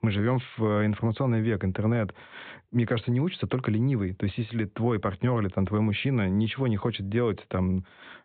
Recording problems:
high frequencies cut off; severe; nothing above 4 kHz

